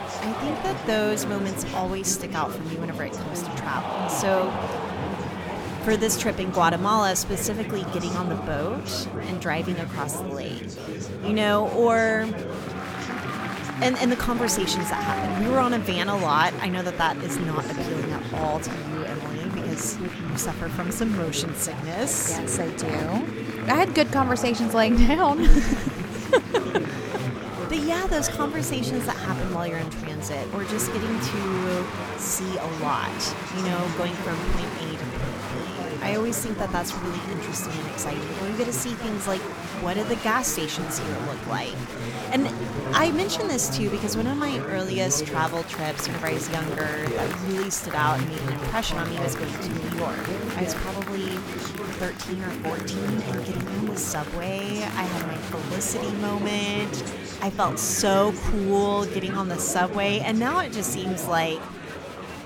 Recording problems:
chatter from many people; loud; throughout; 5 dB below the speech

